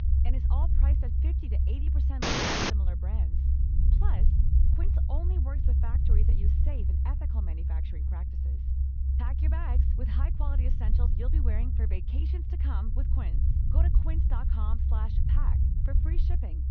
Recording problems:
high frequencies cut off; noticeable; nothing above 6.5 kHz
muffled; very slightly; fading above 3.5 kHz
low rumble; very loud; throughout; as loud as the speech
audio cutting out; at 2 s

